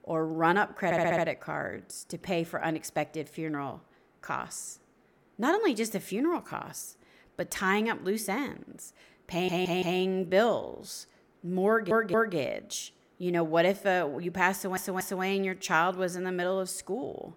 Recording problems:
audio stuttering; 4 times, first at 1 s

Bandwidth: 17.5 kHz